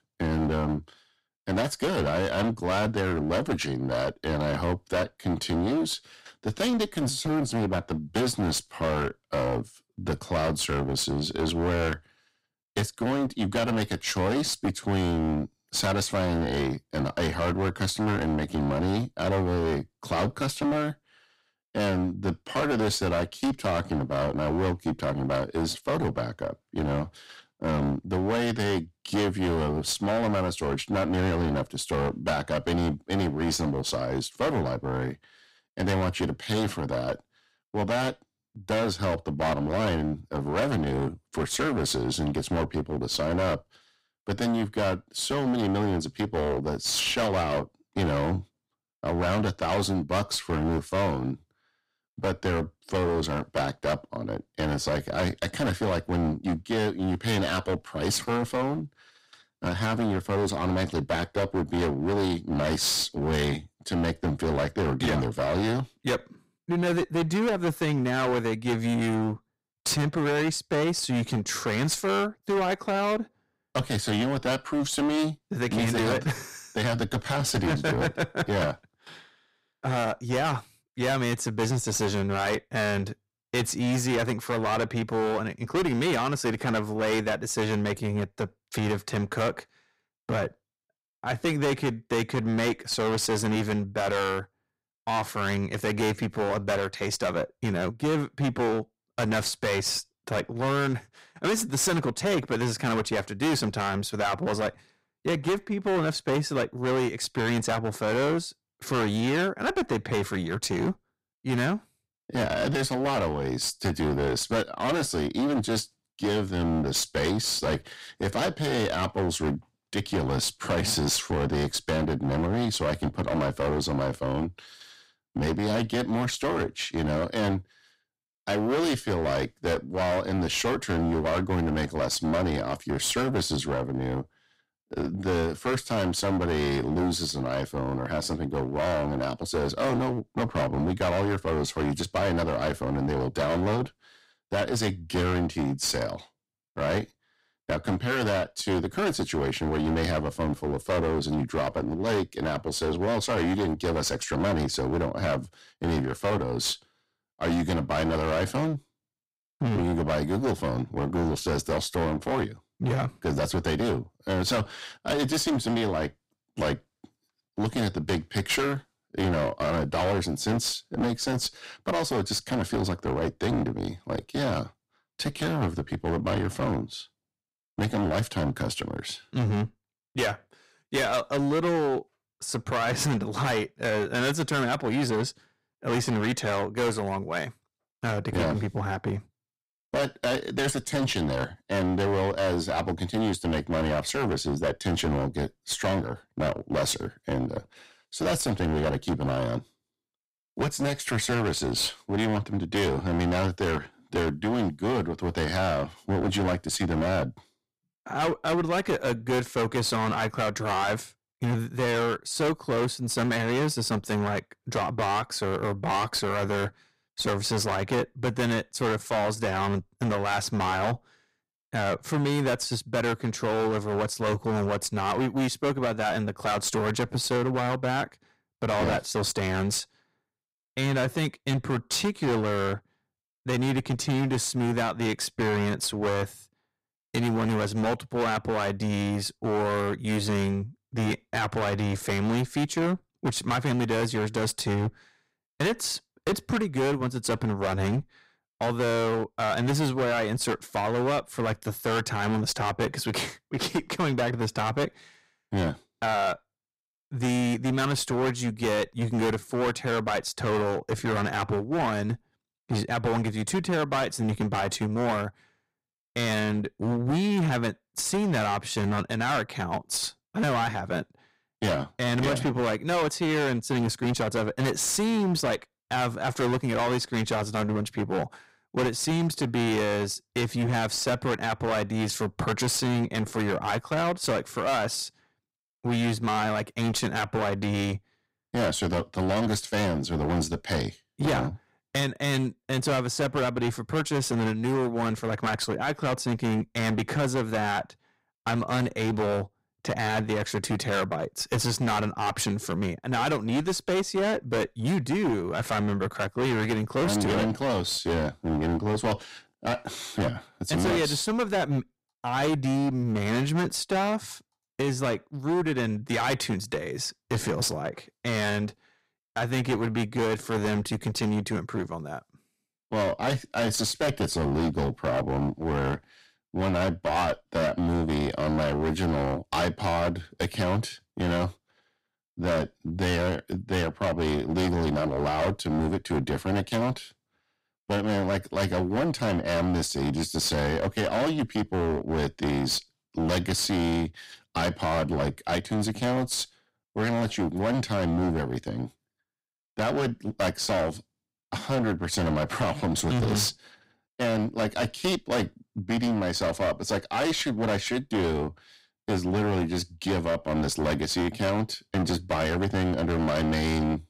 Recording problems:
distortion; heavy; 20% of the sound clipped

